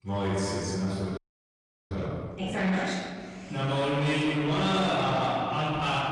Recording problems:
room echo; strong; dies away in 2 s
off-mic speech; far
distortion; slight; 10 dB below the speech
garbled, watery; slightly; nothing above 10 kHz
audio freezing; at 1 s for 0.5 s

